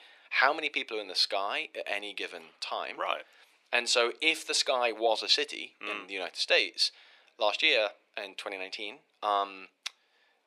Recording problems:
thin; very; fading below 400 Hz

